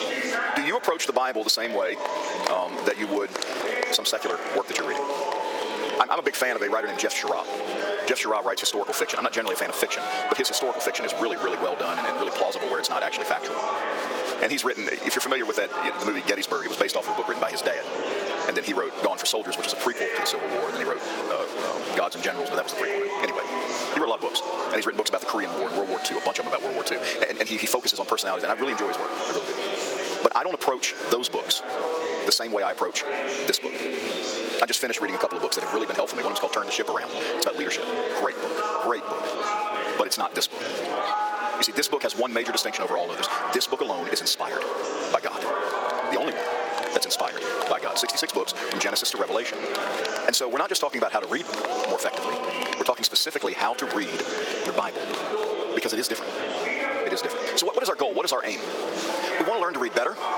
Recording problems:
wrong speed, natural pitch; too fast; 1.8 times normal speed
thin; somewhat; fading below 350 Hz
squashed, flat; somewhat, background pumping
murmuring crowd; loud; throughout; 4 dB below the speech

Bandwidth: 18 kHz